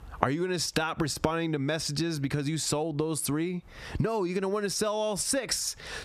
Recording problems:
squashed, flat; somewhat

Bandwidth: 14 kHz